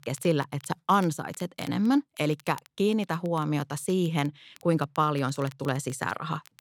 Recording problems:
crackle, like an old record; faint; 25 dB below the speech

